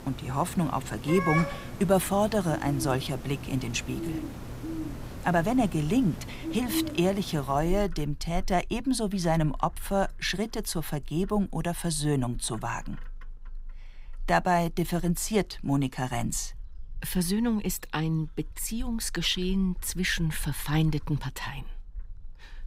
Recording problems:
animal sounds; noticeable; throughout; 10 dB below the speech

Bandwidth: 15.5 kHz